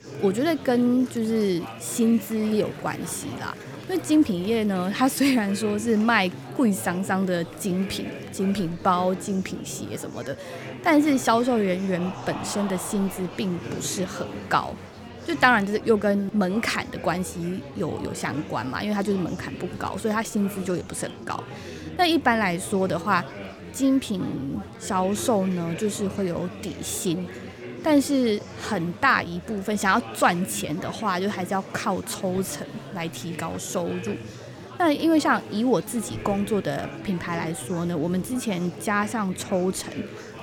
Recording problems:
murmuring crowd; noticeable; throughout; 15 dB below the speech

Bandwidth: 17 kHz